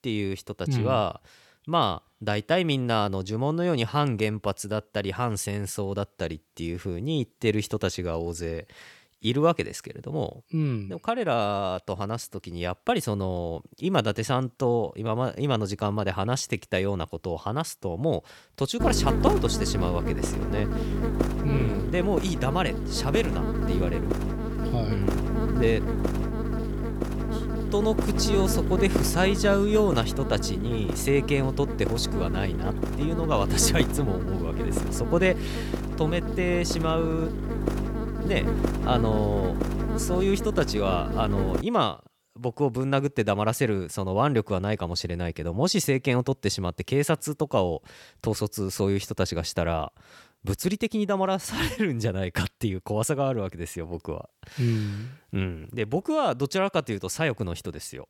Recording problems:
electrical hum; loud; from 19 to 42 s; 50 Hz, 5 dB below the speech

